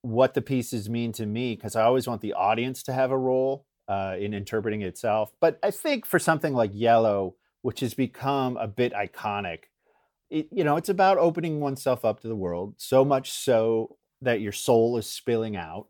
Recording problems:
none

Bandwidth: 18.5 kHz